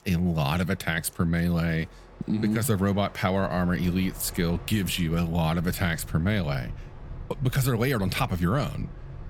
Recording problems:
train or aircraft noise; noticeable; throughout; 15 dB below the speech

